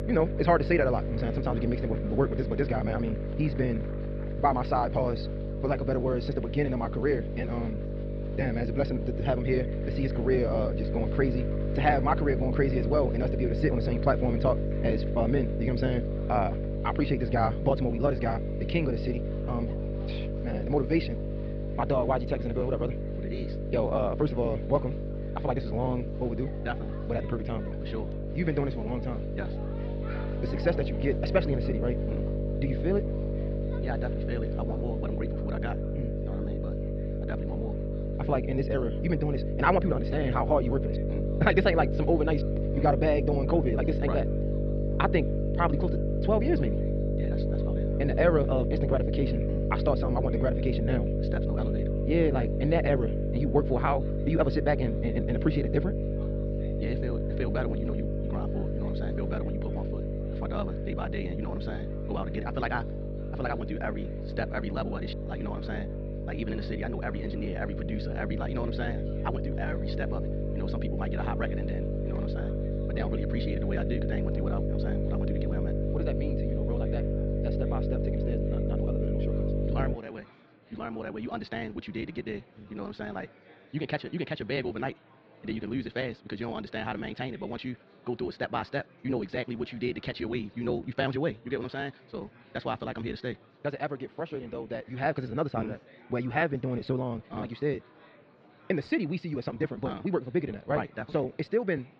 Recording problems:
wrong speed, natural pitch; too fast; 1.7 times normal speed
muffled; very slightly; fading above 4.5 kHz
electrical hum; loud; until 1:20; 50 Hz, 5 dB below the speech
murmuring crowd; faint; throughout; 25 dB below the speech

